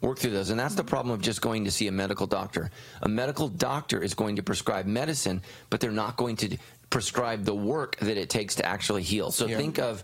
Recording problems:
garbled, watery; slightly; nothing above 15.5 kHz
squashed, flat; somewhat

